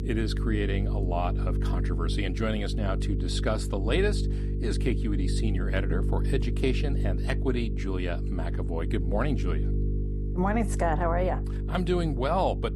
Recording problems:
electrical hum; loud; throughout; 50 Hz, 9 dB below the speech

